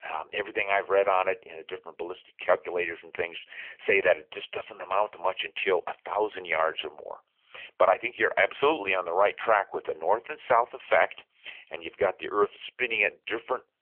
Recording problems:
phone-call audio; poor line; nothing above 3 kHz

